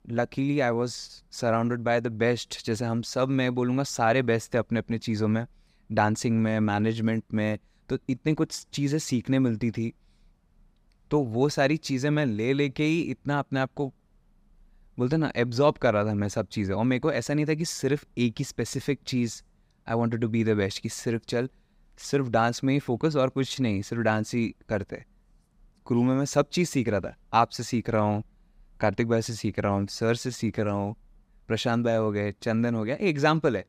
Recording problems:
none

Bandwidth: 15.5 kHz